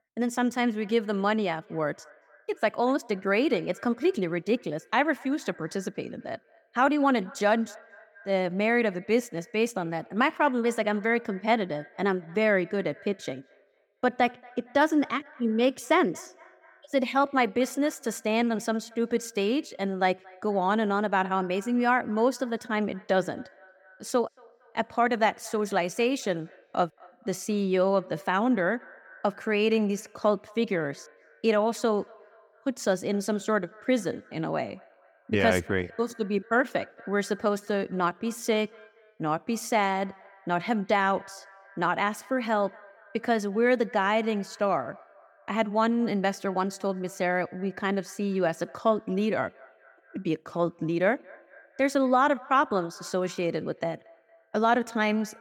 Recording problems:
echo of what is said; faint; throughout; 230 ms later, 25 dB below the speech

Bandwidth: 17.5 kHz